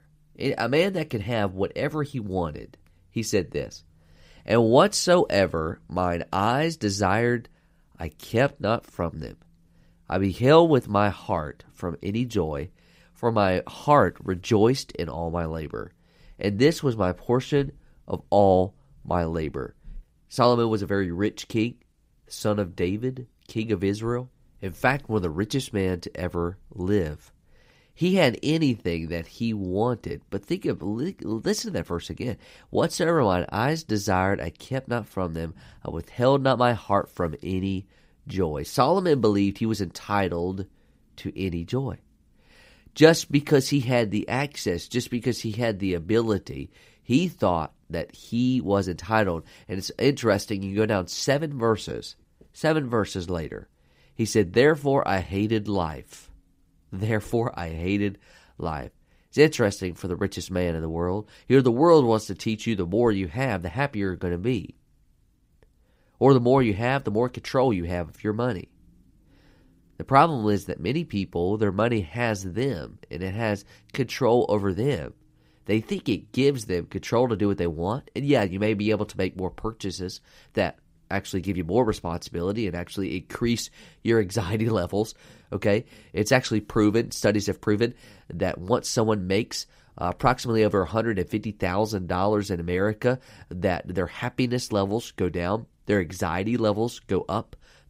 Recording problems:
none

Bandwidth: 15.5 kHz